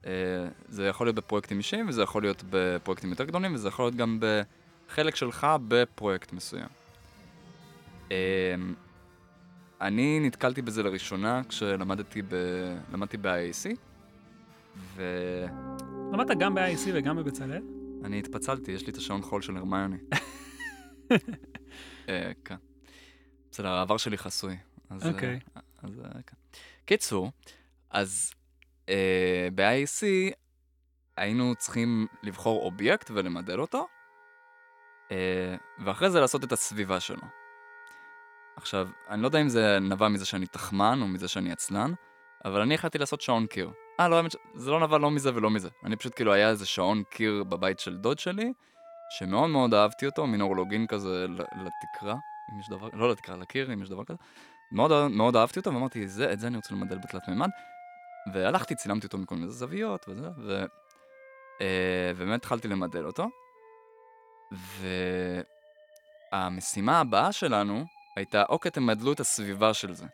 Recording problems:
background music; noticeable; throughout; 20 dB below the speech

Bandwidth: 17.5 kHz